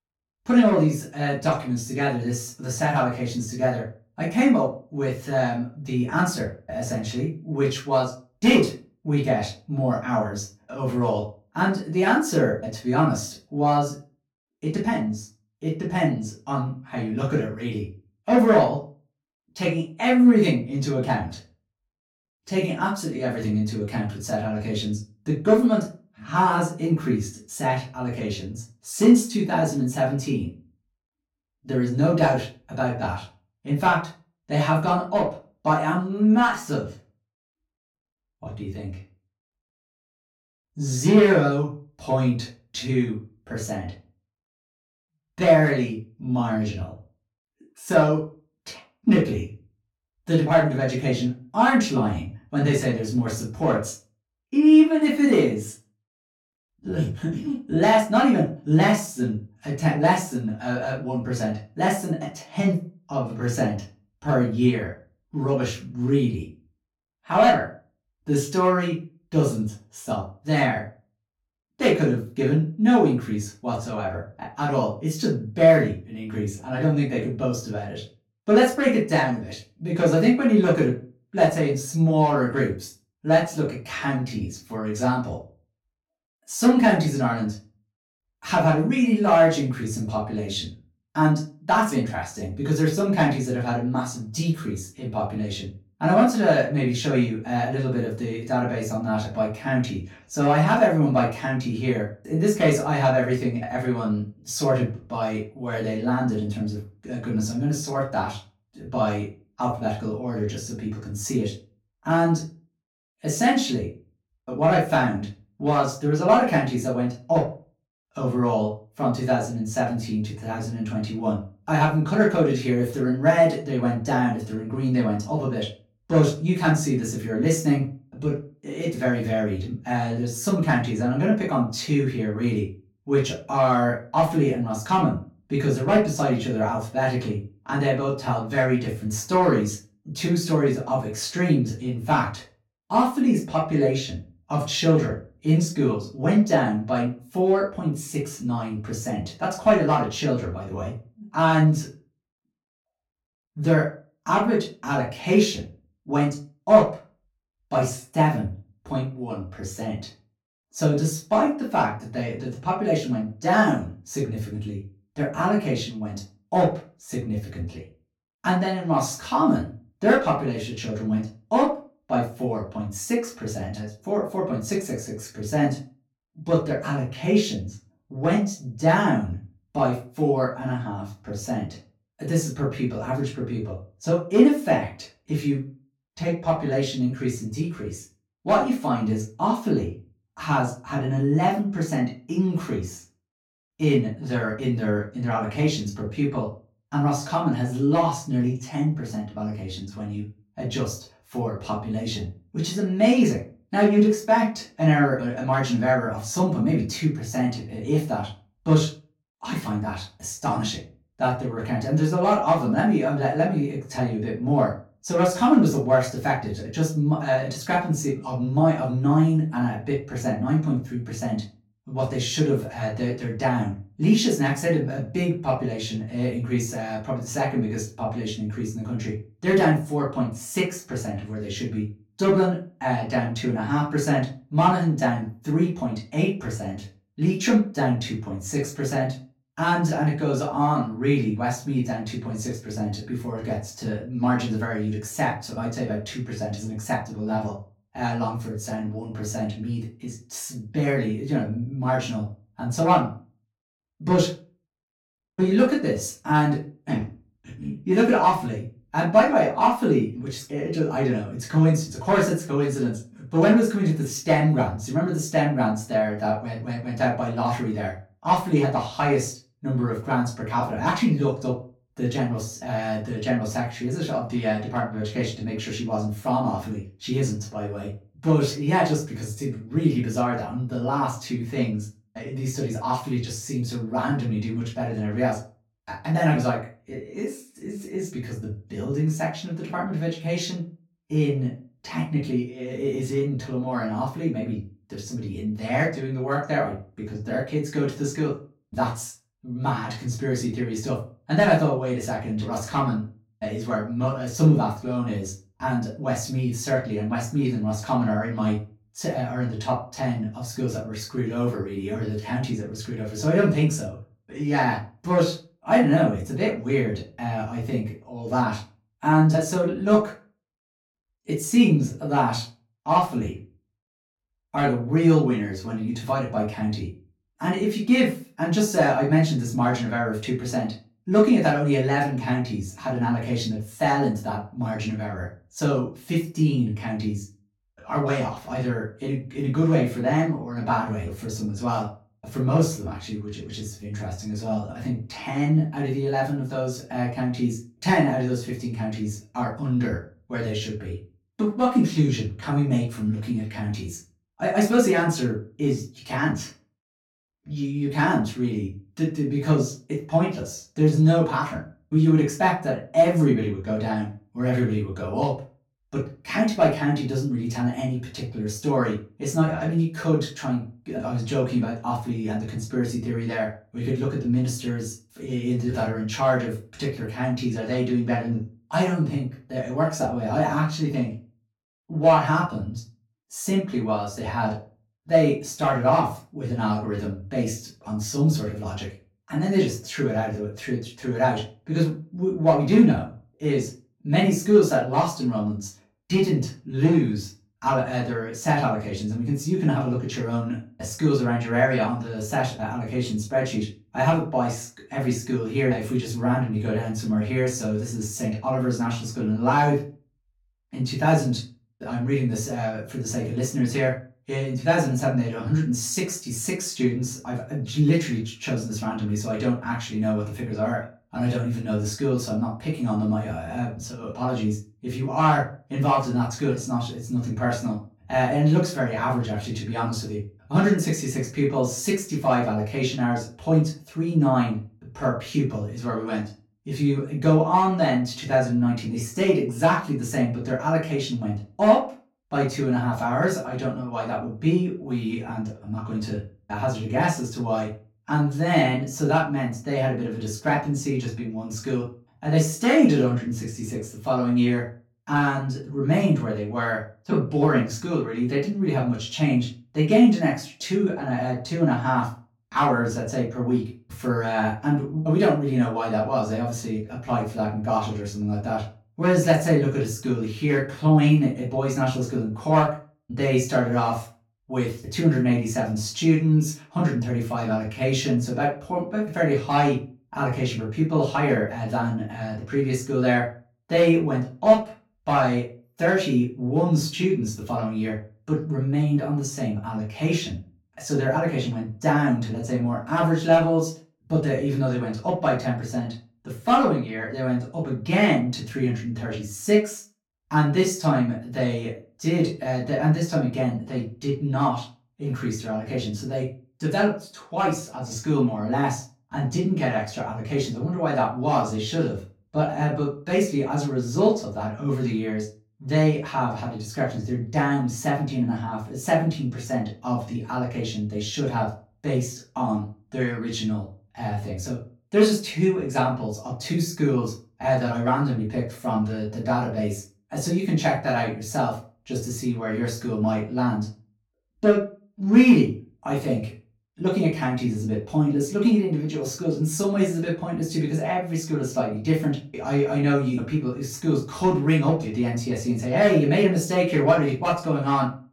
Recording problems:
off-mic speech; far
room echo; slight; dies away in 0.3 s

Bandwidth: 17.5 kHz